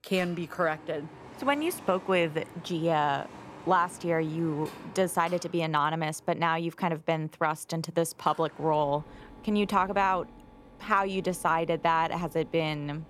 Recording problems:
machinery noise; noticeable; throughout; 20 dB below the speech

